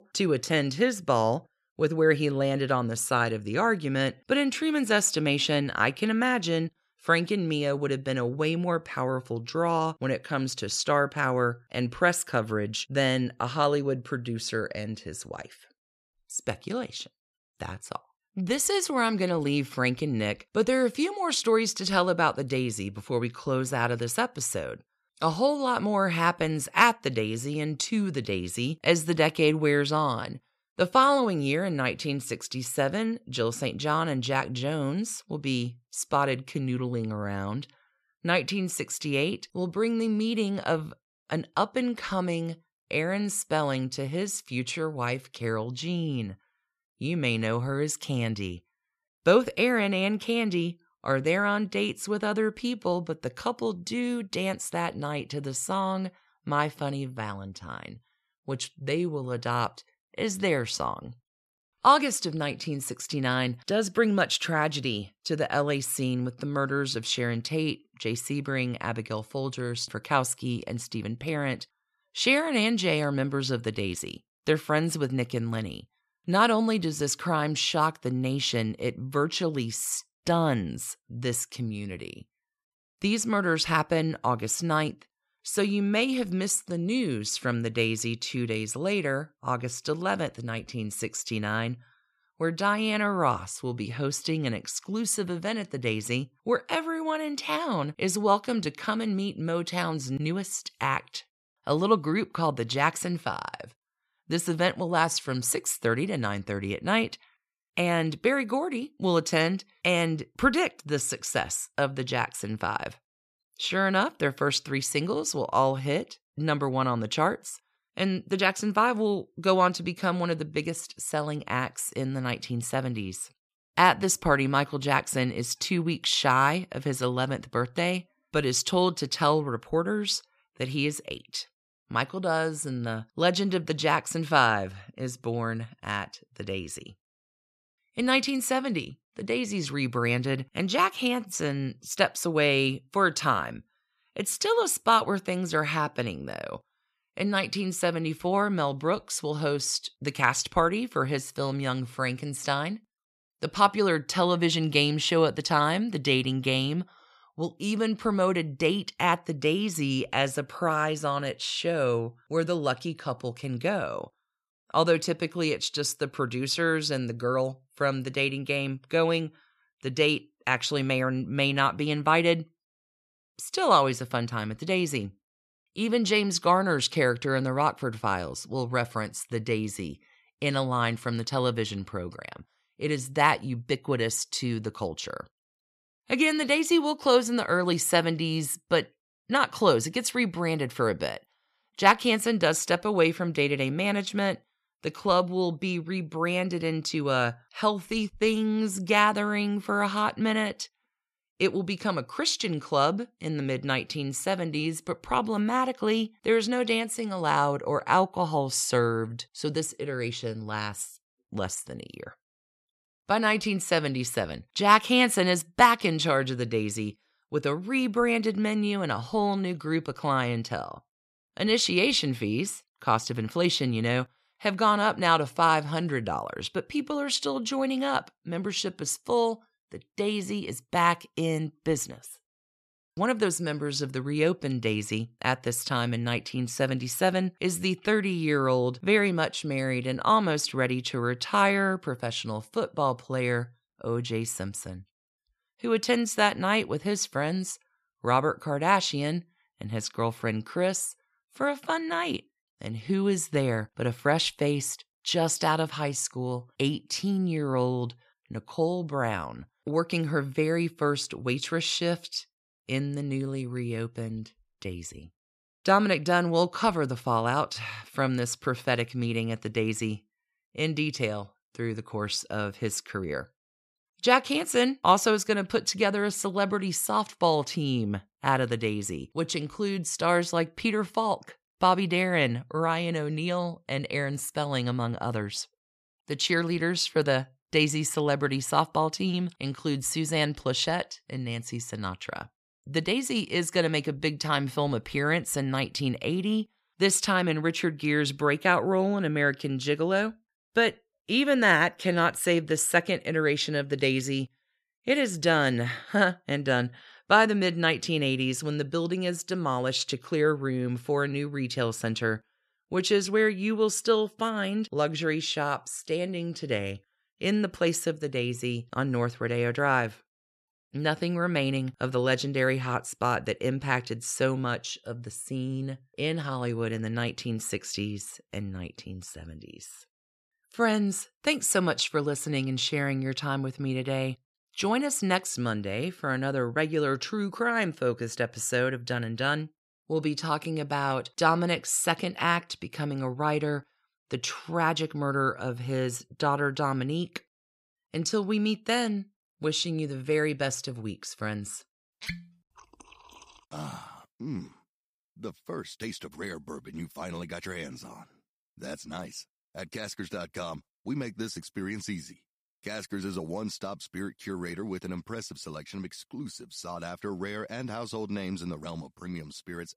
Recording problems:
none

